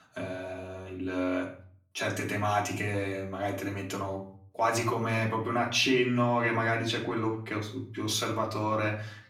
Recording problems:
off-mic speech; far
room echo; slight; dies away in 0.4 s

